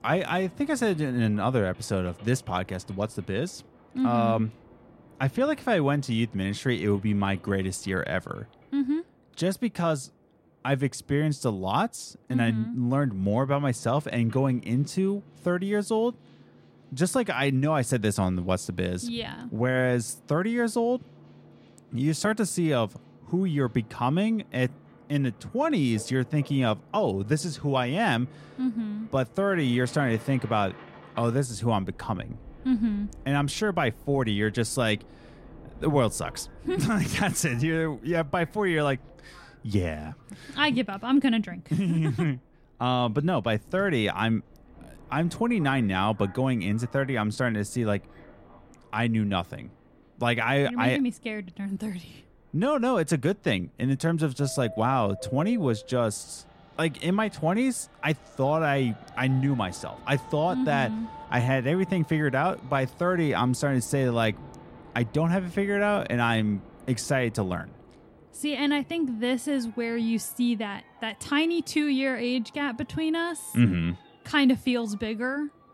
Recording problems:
train or aircraft noise; faint; throughout; 25 dB below the speech

